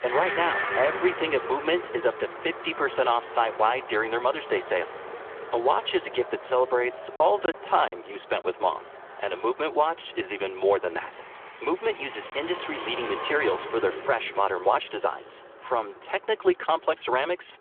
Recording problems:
phone-call audio; nothing above 3.5 kHz
traffic noise; loud; throughout; 10 dB below the speech
choppy; occasionally; from 7 to 8.5 s; 3% of the speech affected

